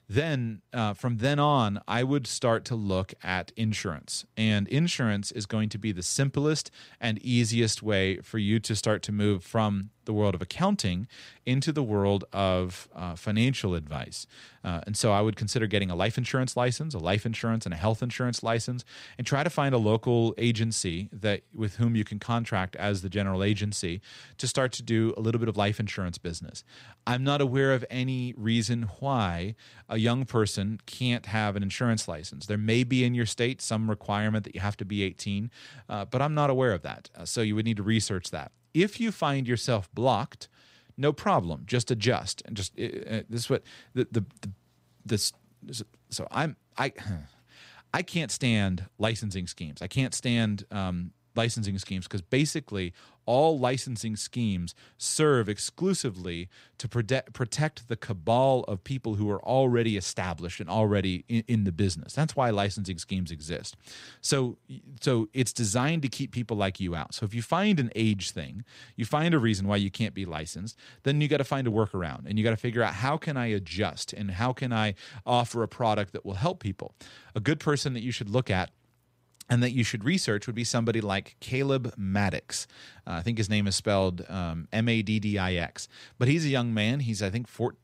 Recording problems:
none

